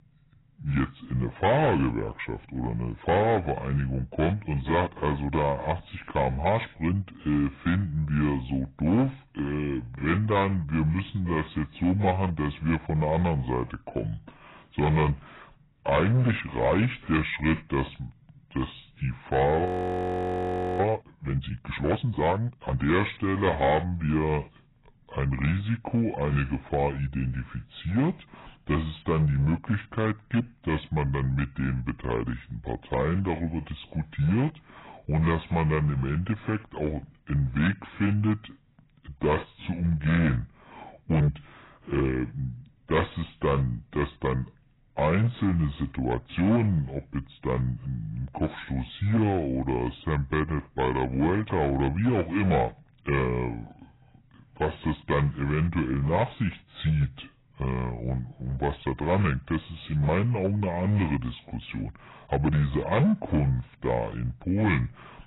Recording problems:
garbled, watery; badly; nothing above 4 kHz
wrong speed and pitch; too slow and too low; 0.7 times normal speed
distortion; slight; 4% of the sound clipped
audio freezing; at 20 s for 1 s

